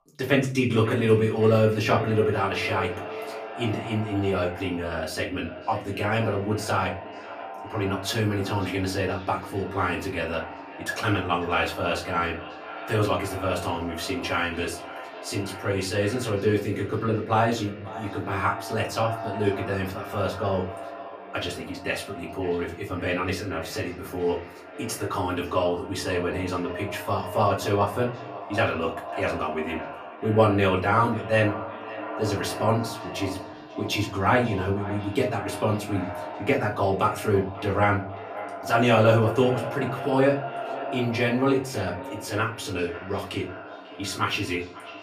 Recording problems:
echo of what is said; strong; throughout; 540 ms later, 10 dB below the speech
off-mic speech; far
room echo; very slight; dies away in 0.3 s

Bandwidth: 15 kHz